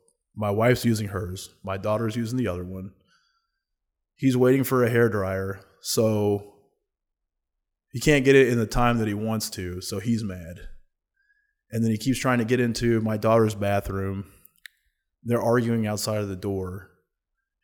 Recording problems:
none

